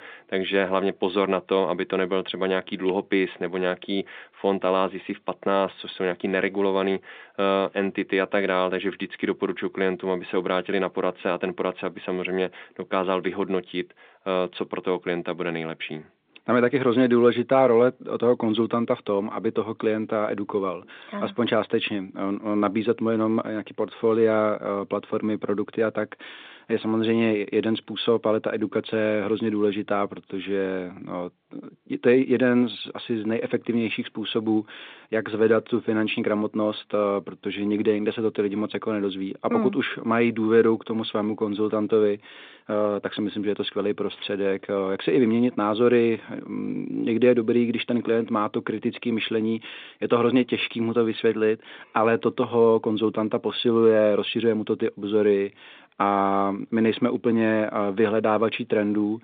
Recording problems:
phone-call audio; nothing above 3.5 kHz

